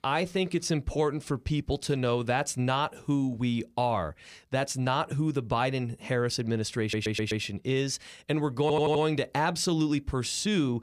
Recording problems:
audio stuttering; at 7 s and at 8.5 s

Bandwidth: 15 kHz